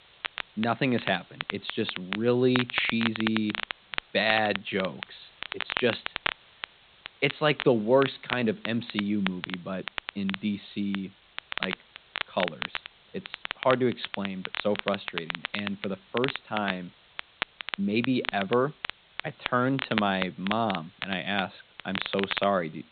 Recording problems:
high frequencies cut off; severe; nothing above 4 kHz
crackle, like an old record; loud; 6 dB below the speech
hiss; faint; throughout; 25 dB below the speech

